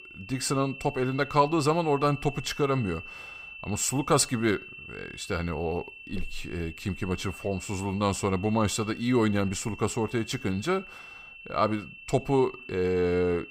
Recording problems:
high-pitched whine; noticeable; throughout; 2.5 kHz, 15 dB below the speech

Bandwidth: 15.5 kHz